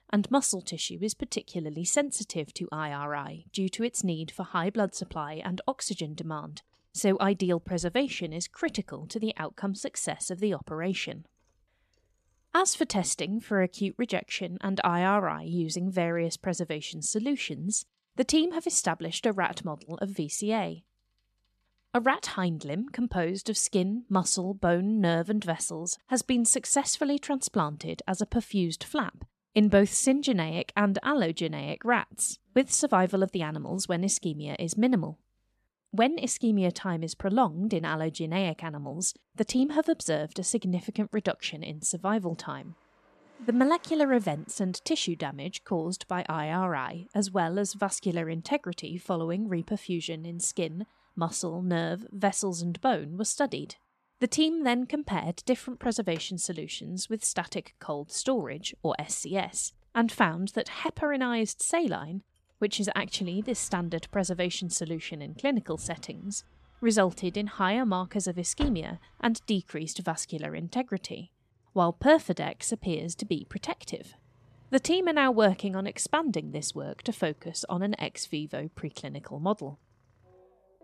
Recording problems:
traffic noise; faint; throughout; 25 dB below the speech

